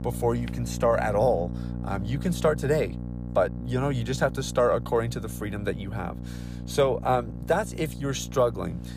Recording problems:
electrical hum; noticeable; throughout; 60 Hz, 15 dB below the speech

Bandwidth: 15 kHz